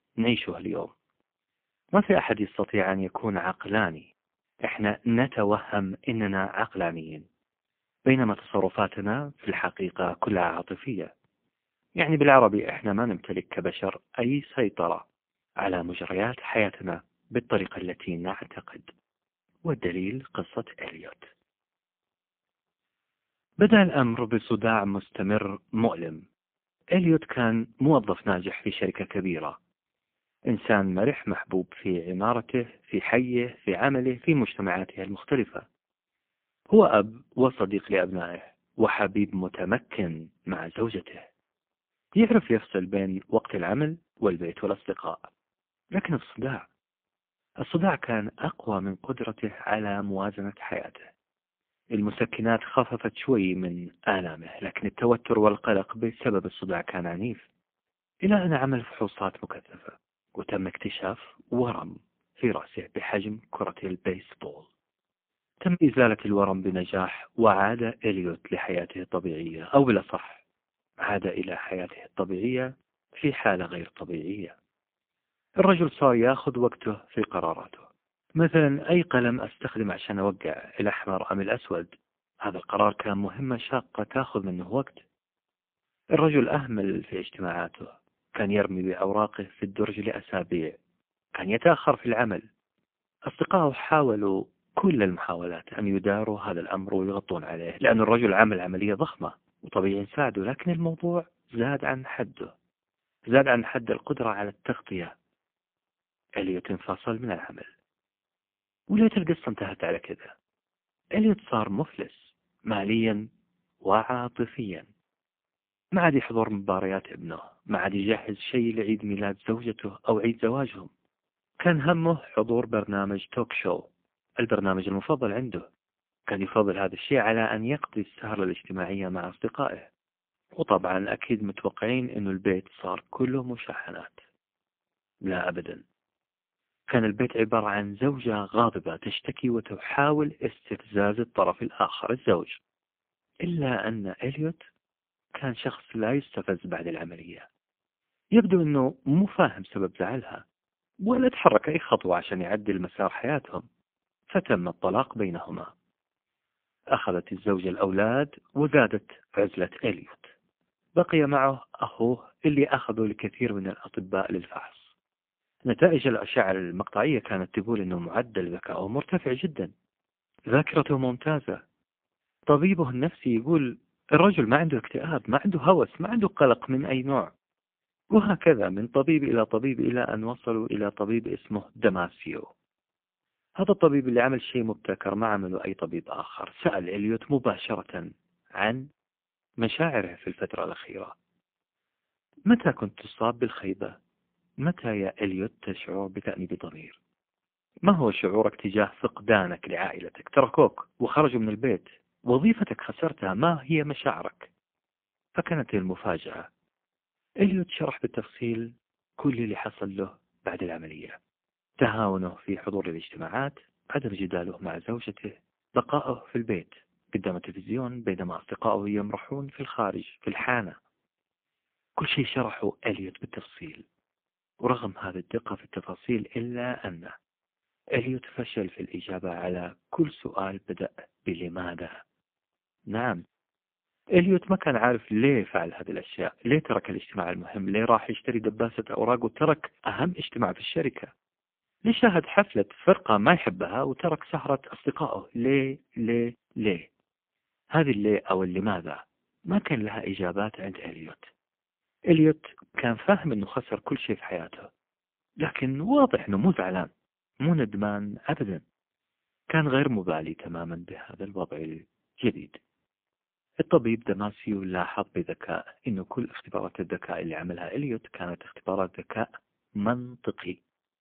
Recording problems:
phone-call audio; poor line

